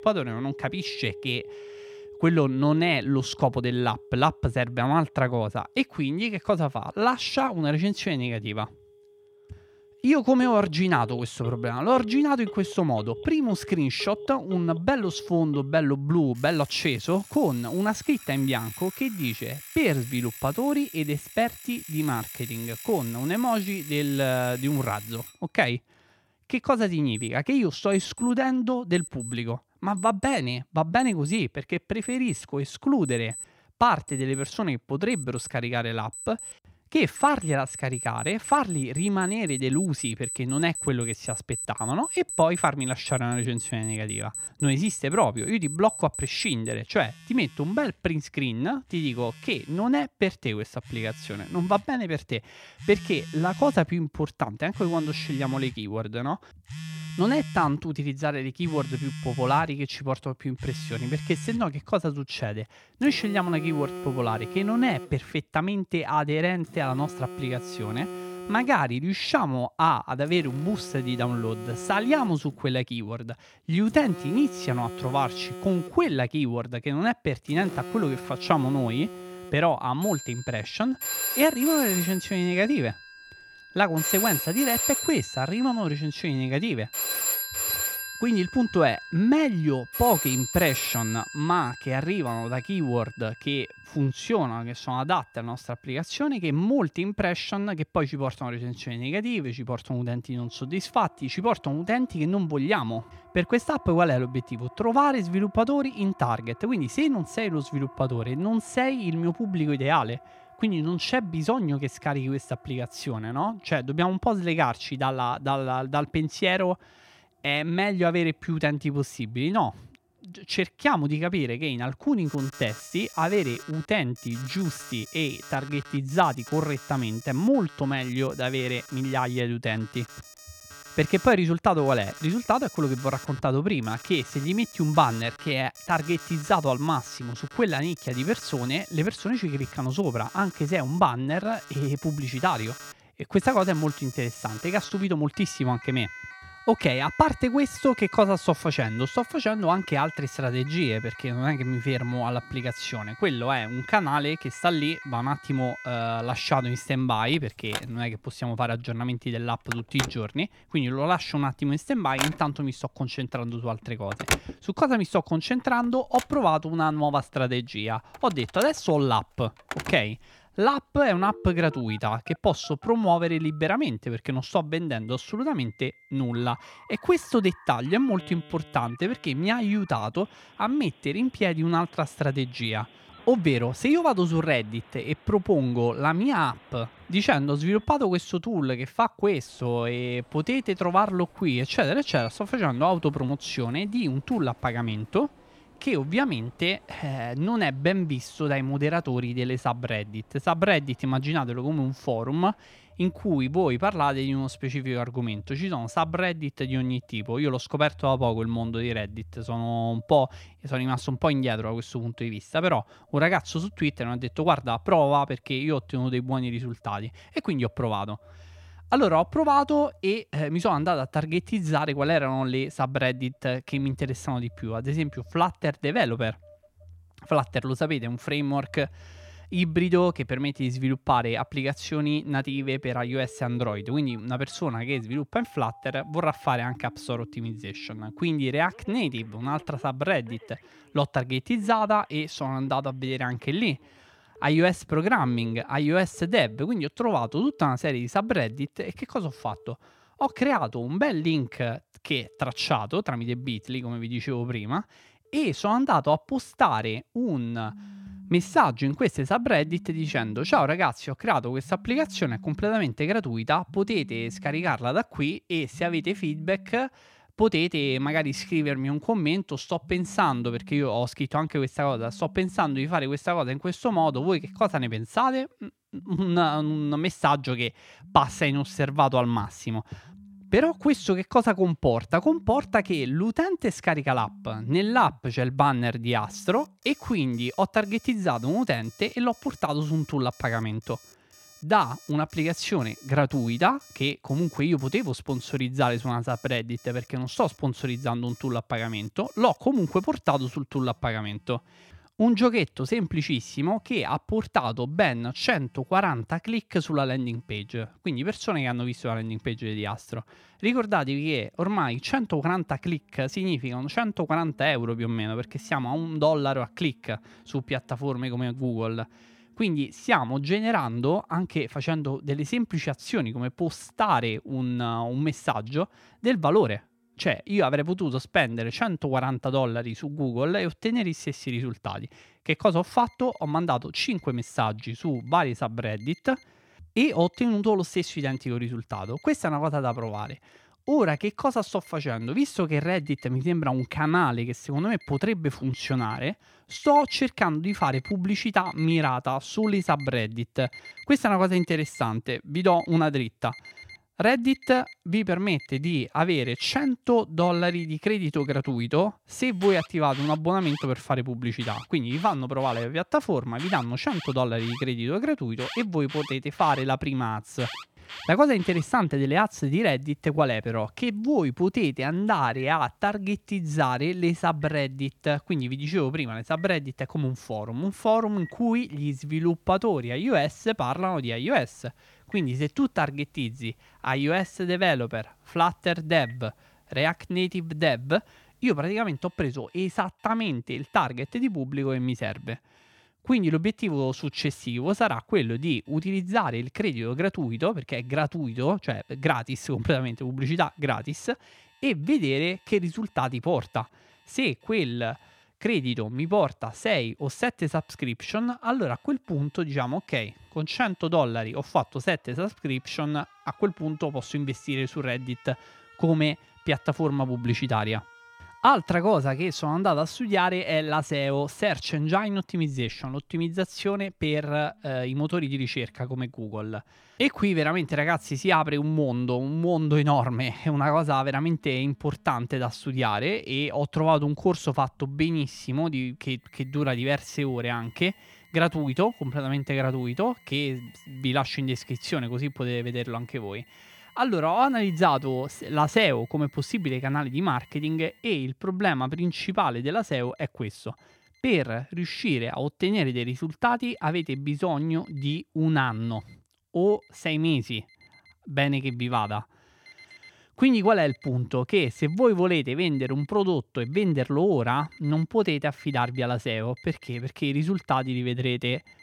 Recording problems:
alarms or sirens; noticeable; throughout; 10 dB below the speech

